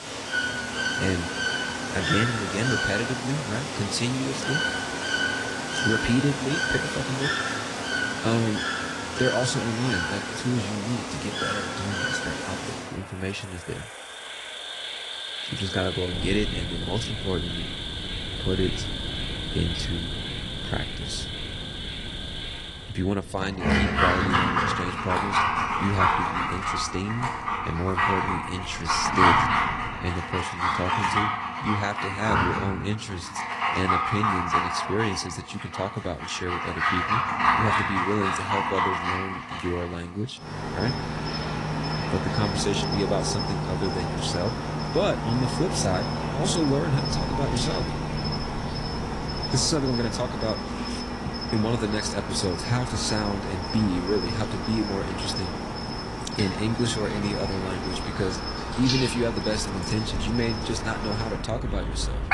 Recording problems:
garbled, watery; slightly; nothing above 10 kHz
animal sounds; very loud; throughout; 2 dB above the speech
wind noise on the microphone; occasional gusts; from 16 to 30 s and from 47 s on; 15 dB below the speech

